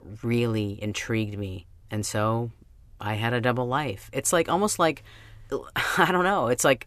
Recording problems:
none

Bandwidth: 14 kHz